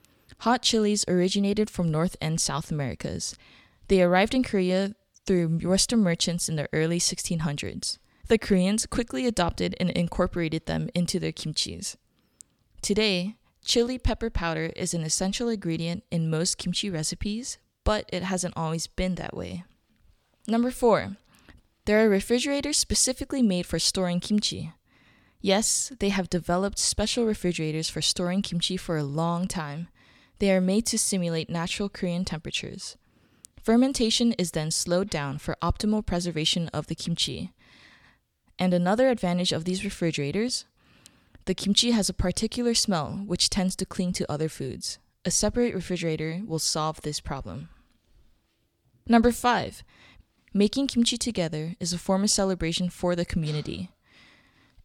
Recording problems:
none

